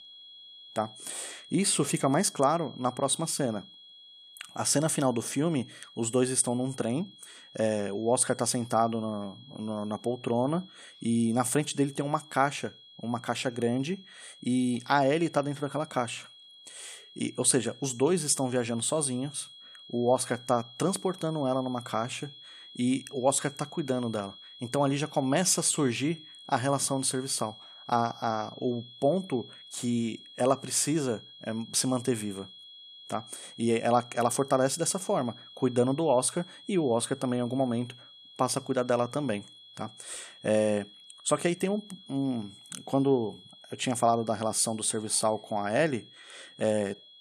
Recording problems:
high-pitched whine; noticeable; throughout; 3.5 kHz, 20 dB below the speech

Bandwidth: 14 kHz